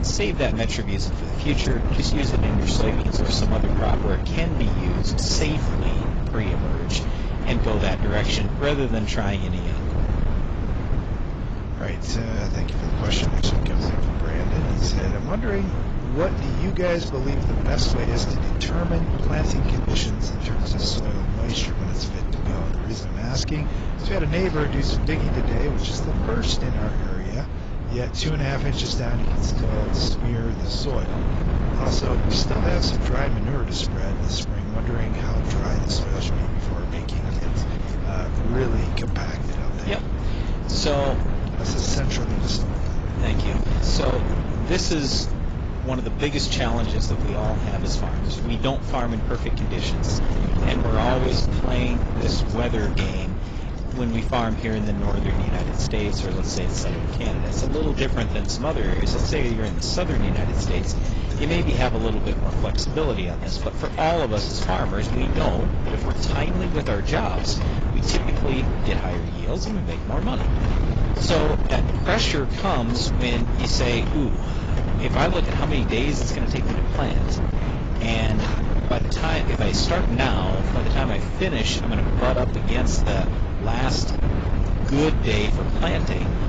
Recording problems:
garbled, watery; badly; nothing above 7.5 kHz
distortion; slight; 13% of the sound clipped
wind noise on the microphone; heavy; 5 dB below the speech
rain or running water; noticeable; throughout; 20 dB below the speech

